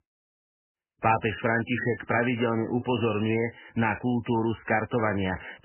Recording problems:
garbled, watery; badly; nothing above 3 kHz

